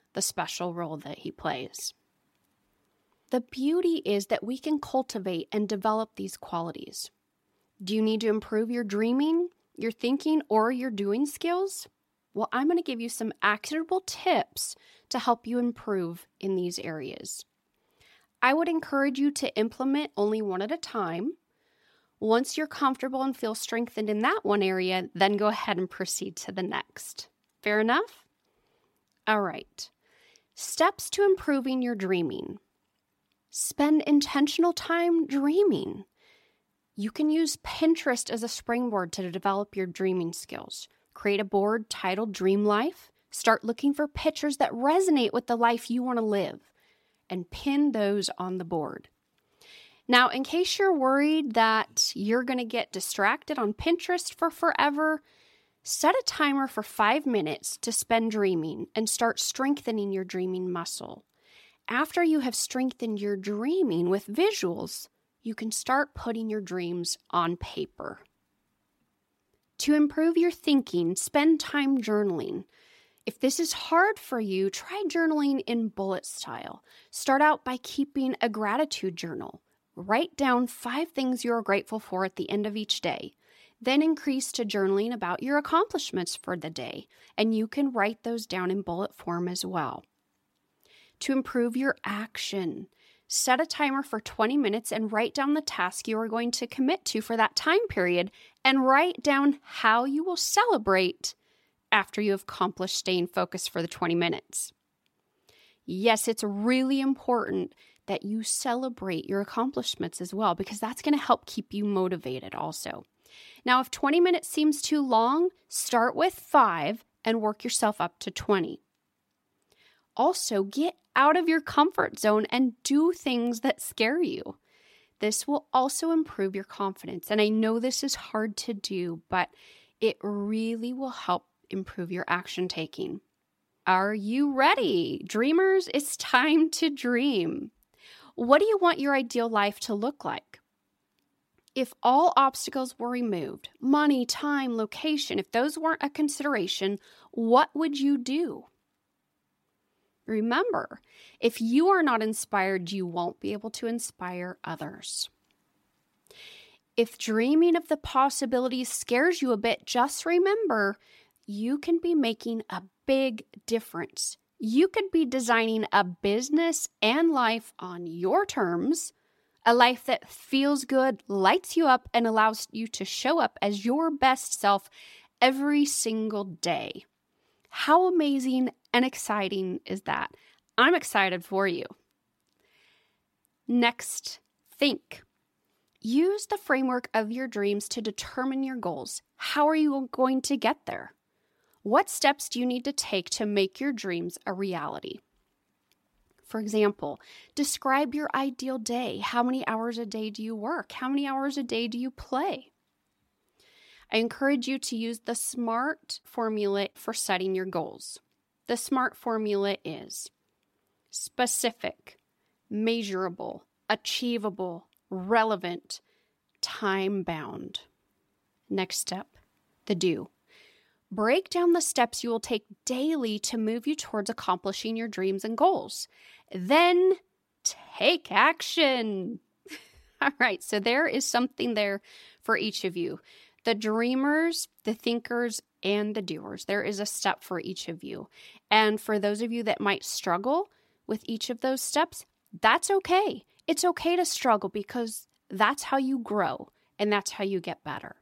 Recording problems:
none

